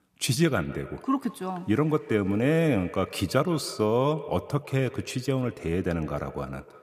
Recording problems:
echo of what is said; noticeable; throughout; 150 ms later, 15 dB below the speech

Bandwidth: 14.5 kHz